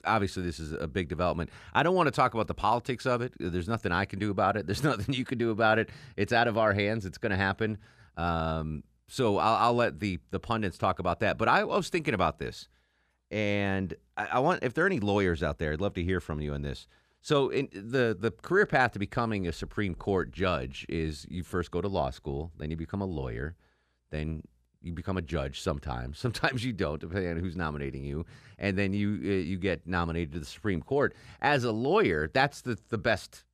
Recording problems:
none

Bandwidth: 14.5 kHz